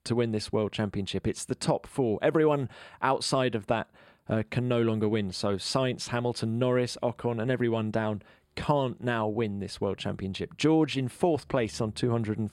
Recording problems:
none

